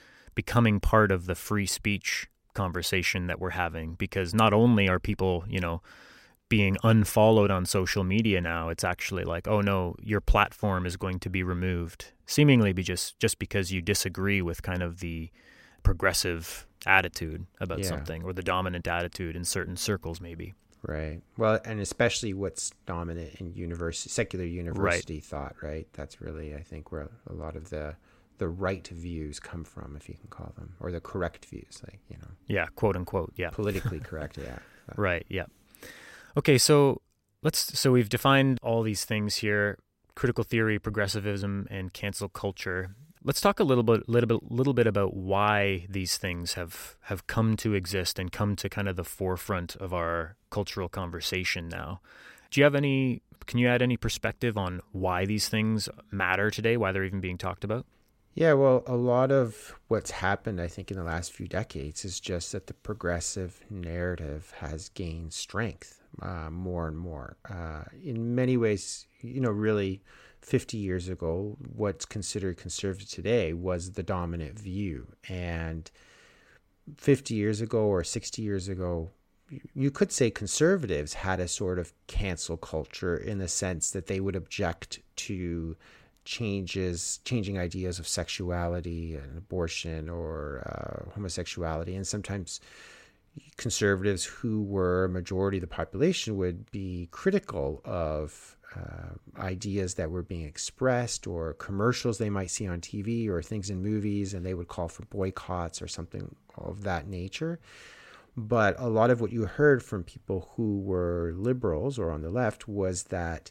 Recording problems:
none

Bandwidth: 16 kHz